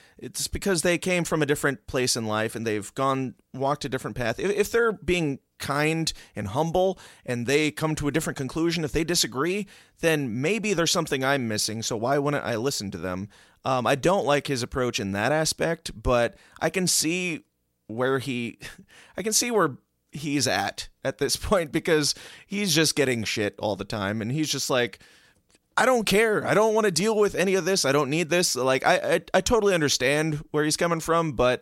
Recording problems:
none

